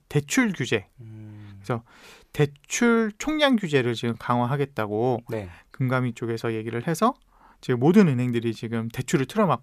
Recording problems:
none

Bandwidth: 14.5 kHz